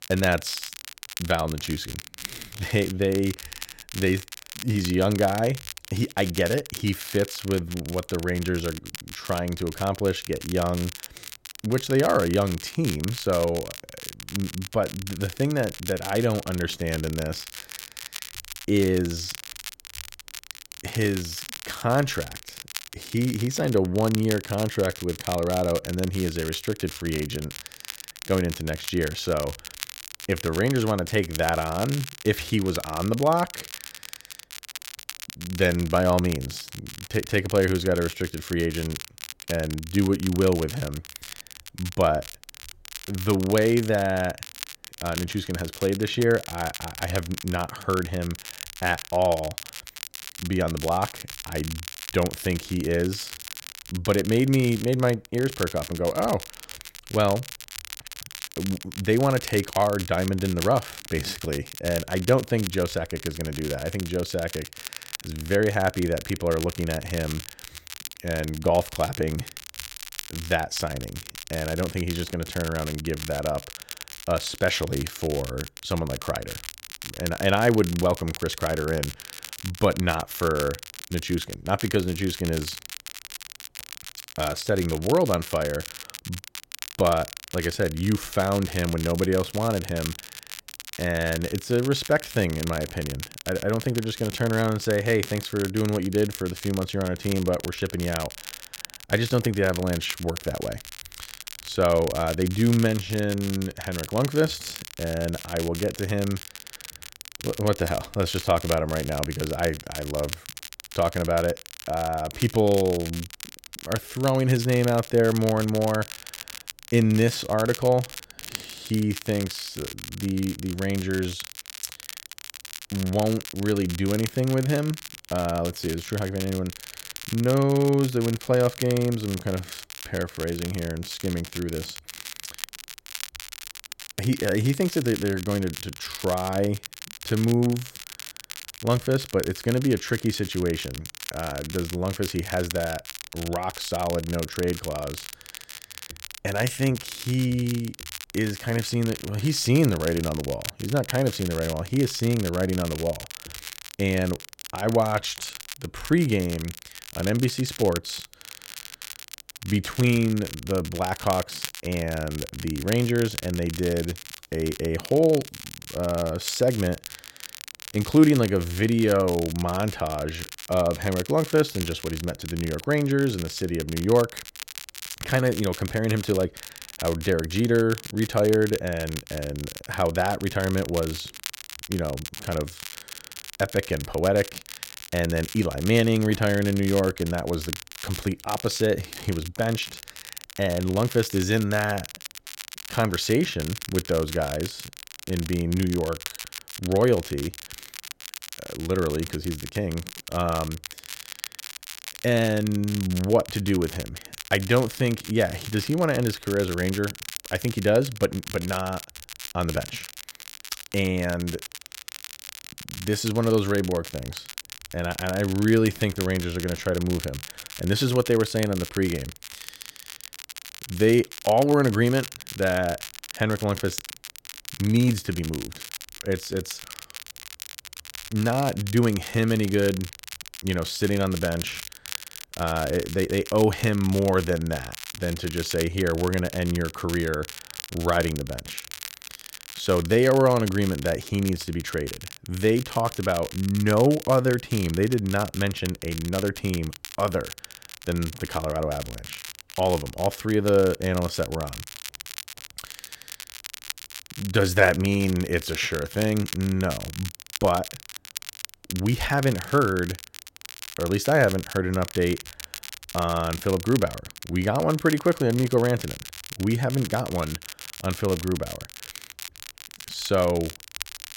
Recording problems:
crackle, like an old record; noticeable; 10 dB below the speech

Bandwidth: 16.5 kHz